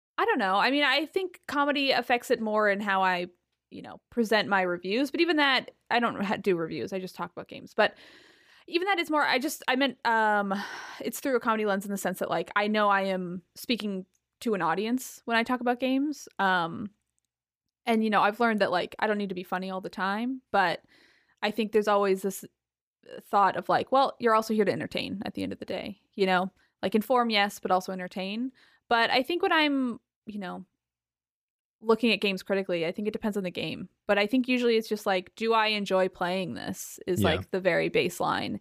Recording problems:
none

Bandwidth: 15 kHz